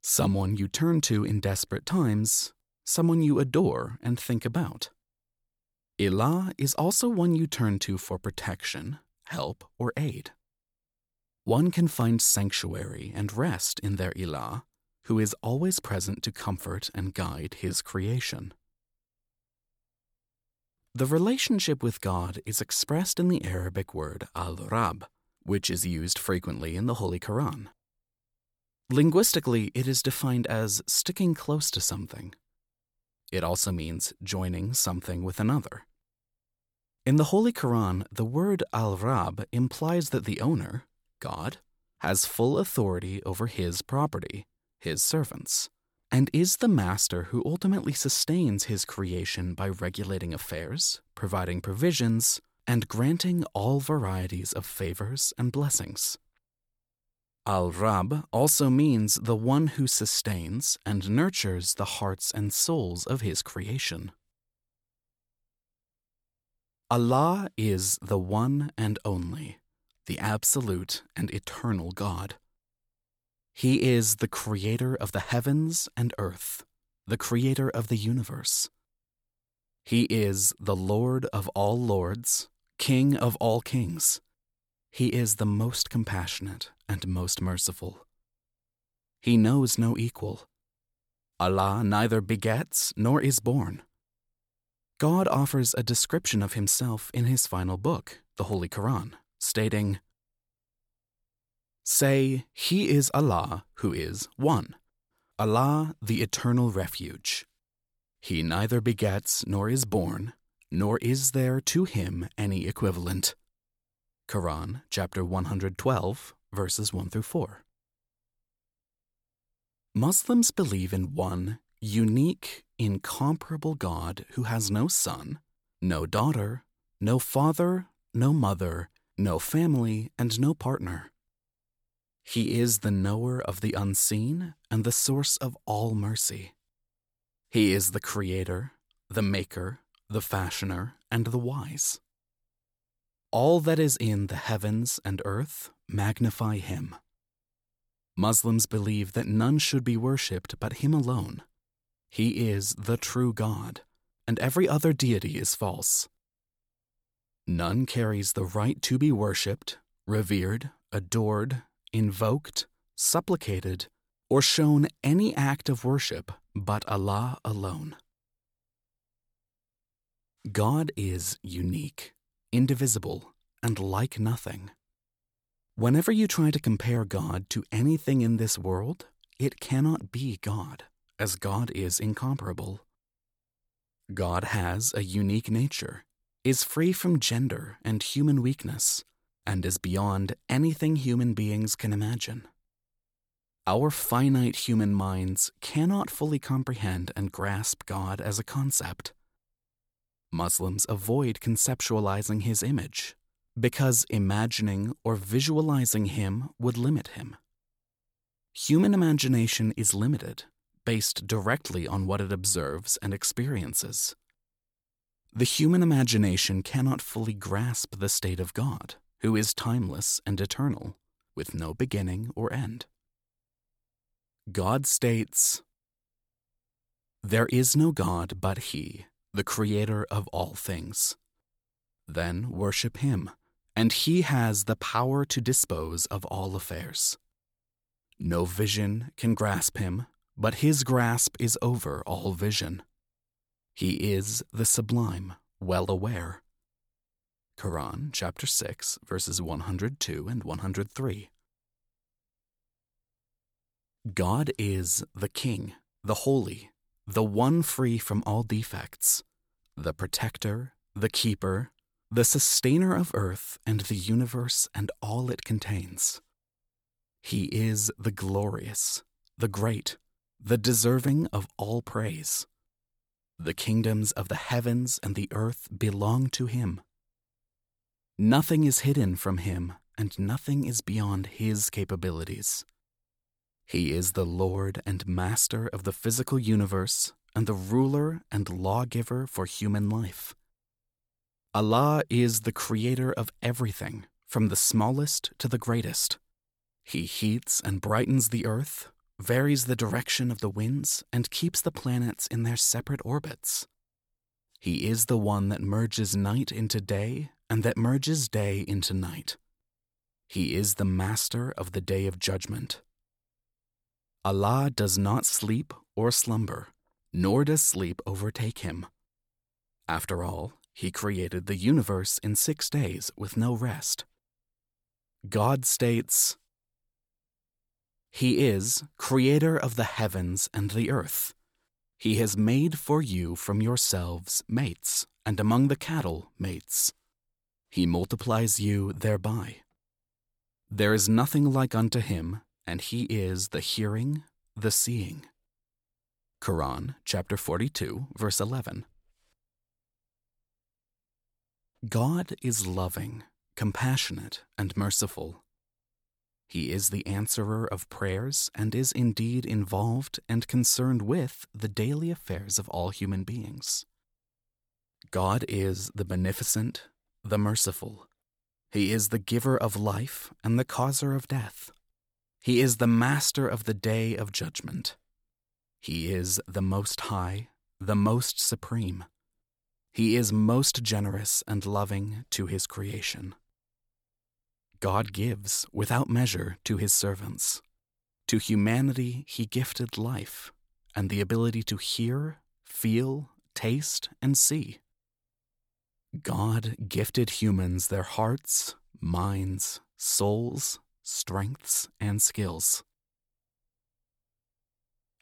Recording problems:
none

